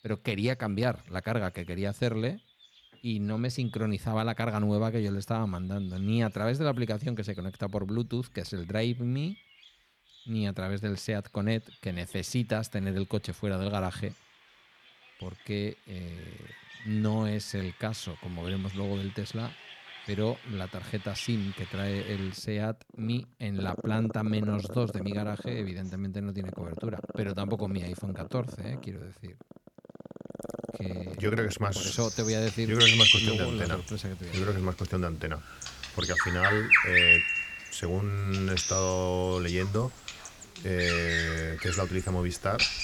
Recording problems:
animal sounds; very loud; throughout; 4 dB above the speech

